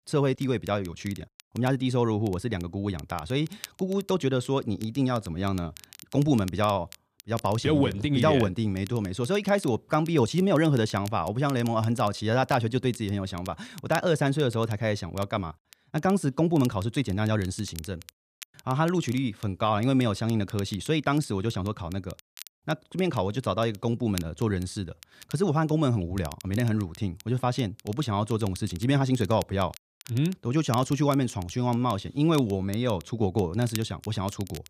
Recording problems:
crackle, like an old record; faint; 20 dB below the speech

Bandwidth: 14.5 kHz